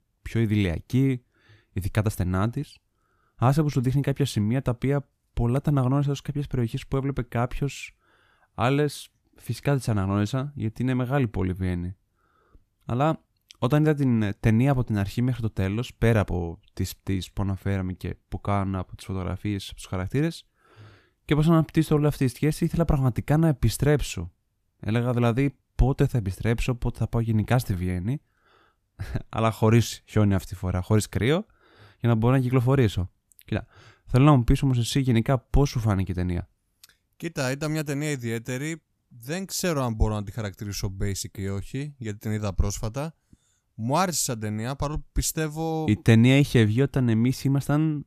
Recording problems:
none

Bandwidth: 14.5 kHz